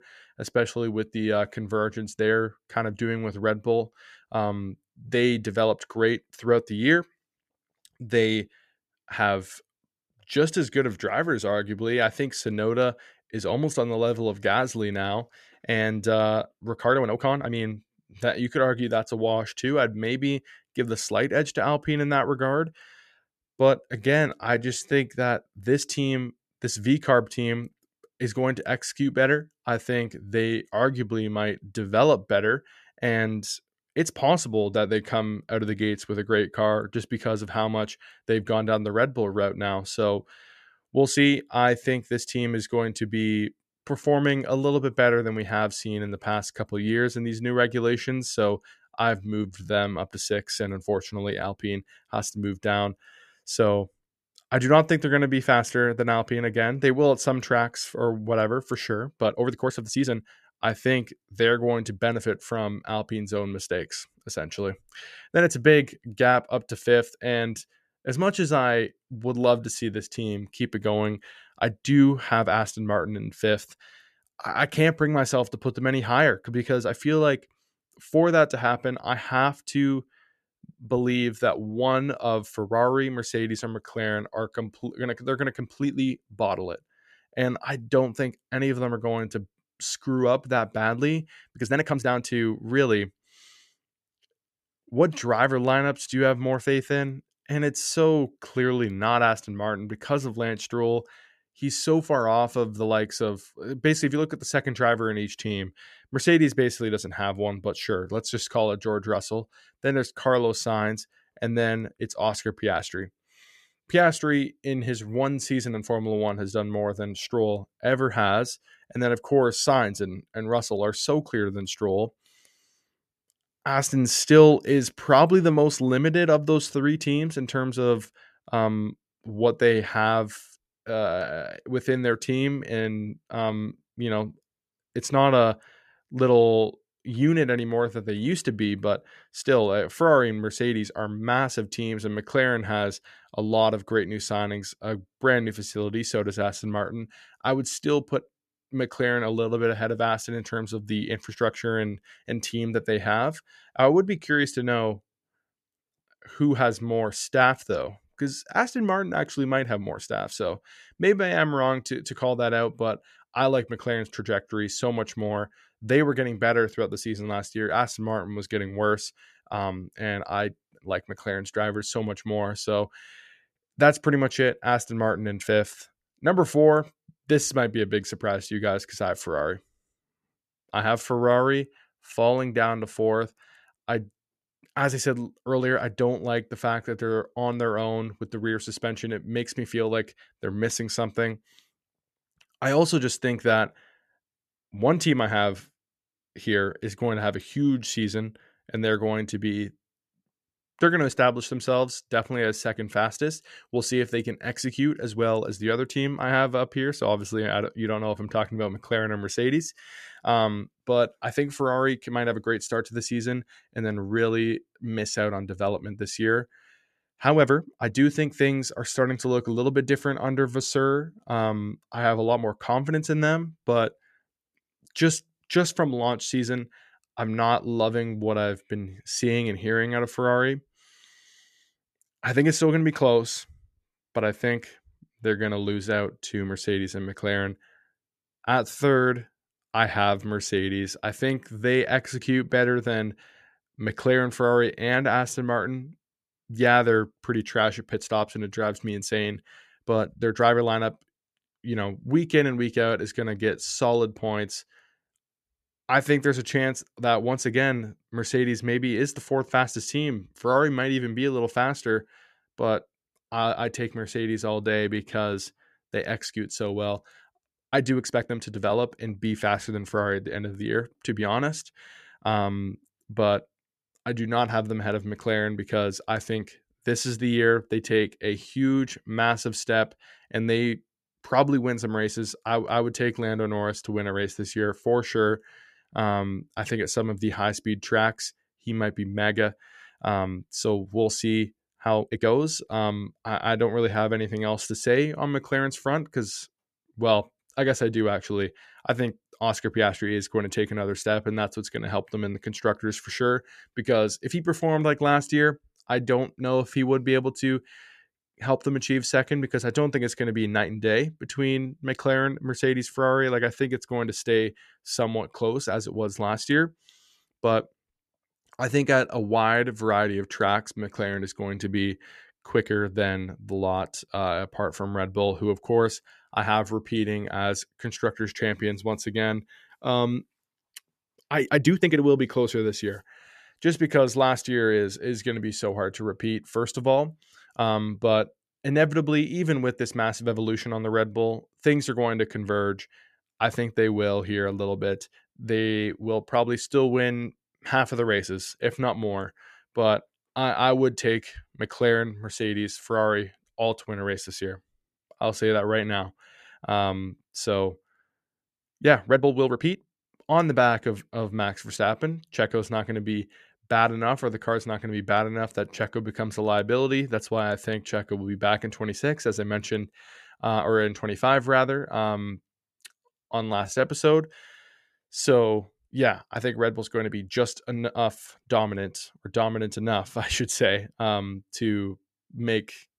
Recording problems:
uneven, jittery; strongly; from 5 s to 6:15

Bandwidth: 14 kHz